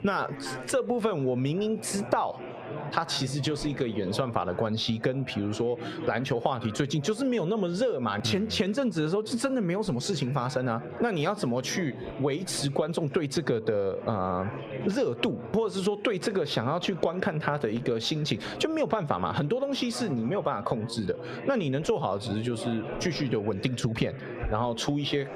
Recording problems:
squashed, flat; heavily, background pumping
muffled; very slightly; fading above 3.5 kHz
chatter from many people; noticeable; throughout; 15 dB below the speech

